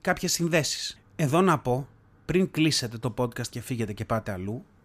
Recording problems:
none

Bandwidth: 14.5 kHz